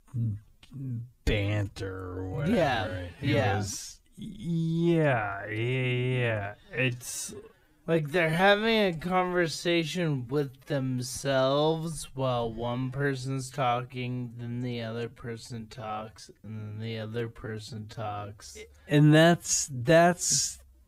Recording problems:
wrong speed, natural pitch; too slow; 0.5 times normal speed

